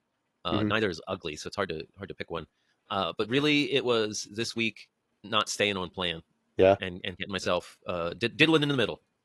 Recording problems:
wrong speed, natural pitch; too fast; 1.5 times normal speed
garbled, watery; slightly; nothing above 11.5 kHz

